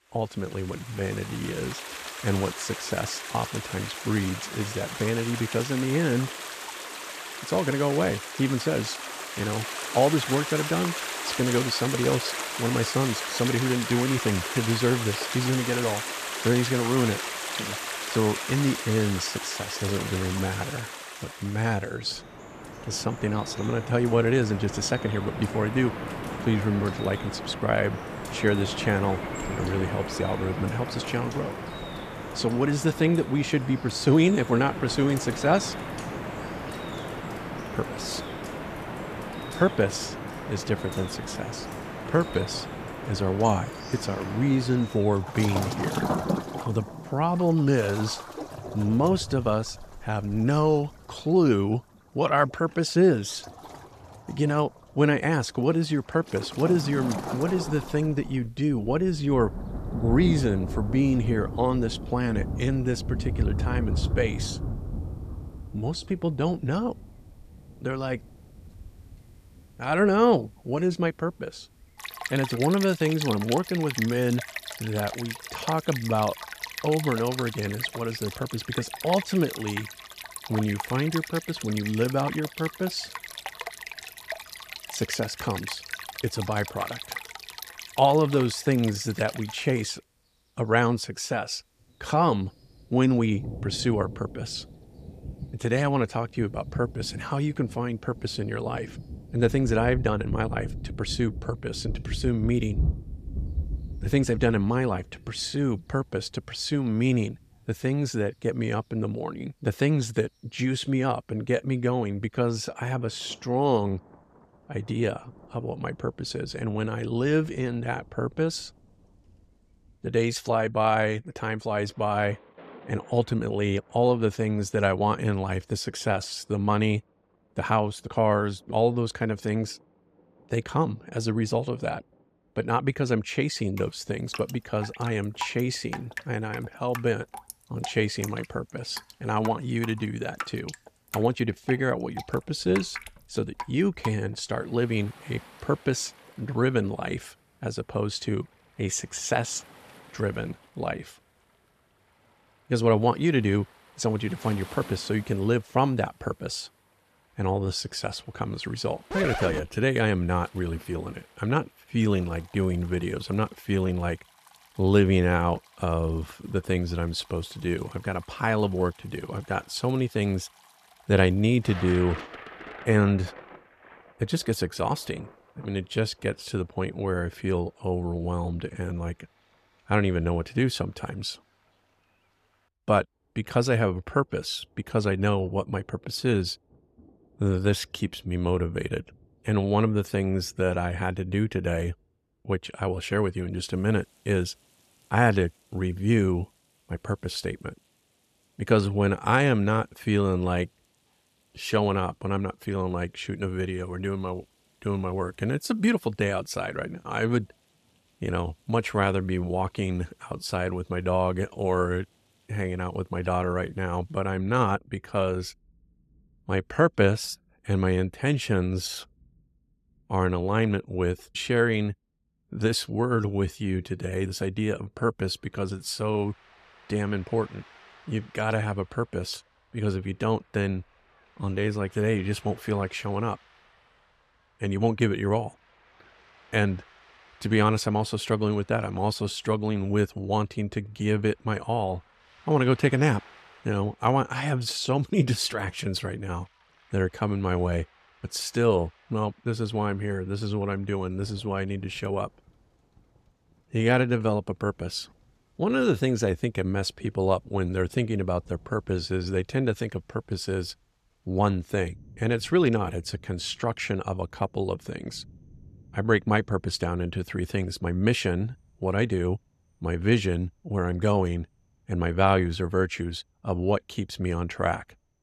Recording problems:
rain or running water; loud; throughout; 8 dB below the speech

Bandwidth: 14.5 kHz